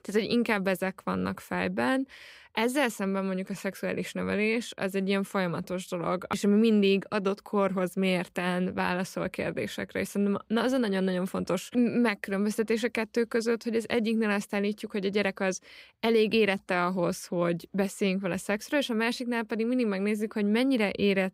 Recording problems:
none

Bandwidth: 15.5 kHz